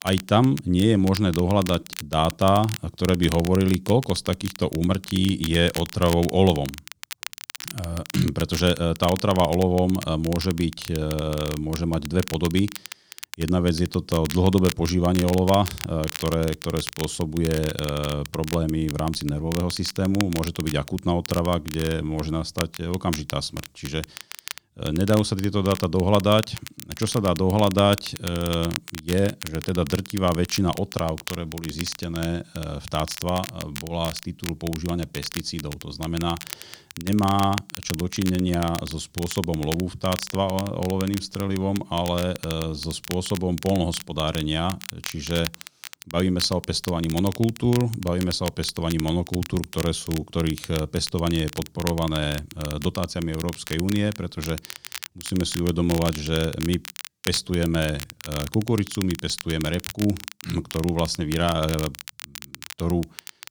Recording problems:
crackle, like an old record; noticeable; 10 dB below the speech

